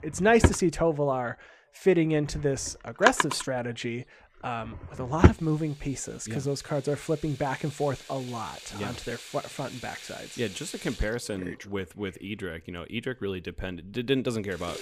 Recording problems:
household noises; very loud; throughout; as loud as the speech

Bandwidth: 15 kHz